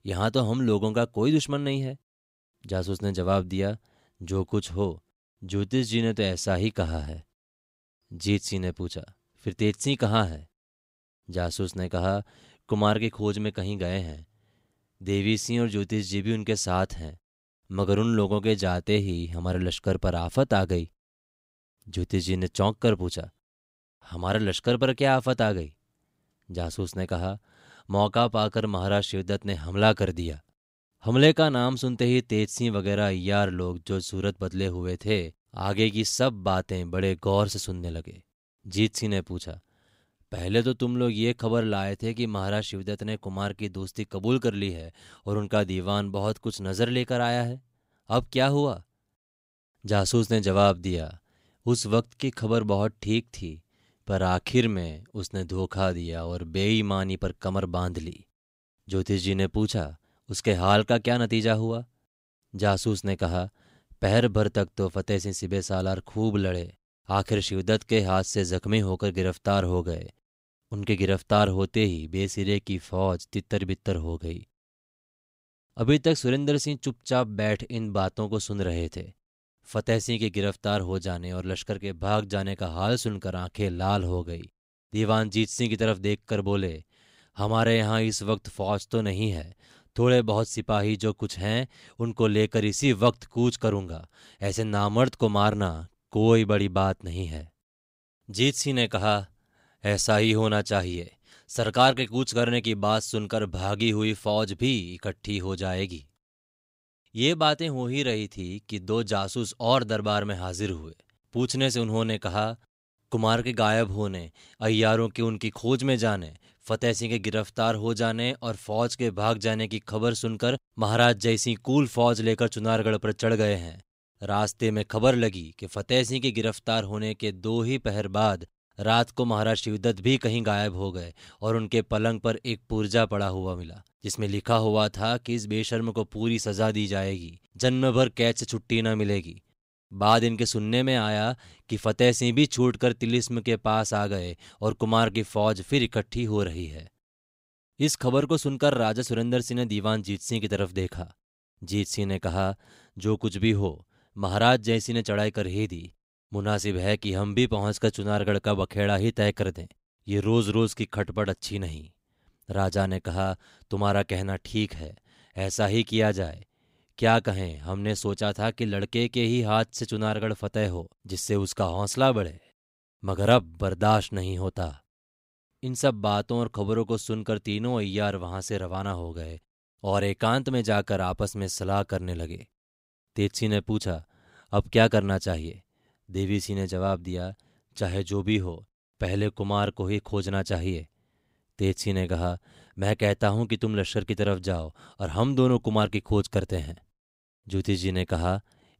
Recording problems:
none

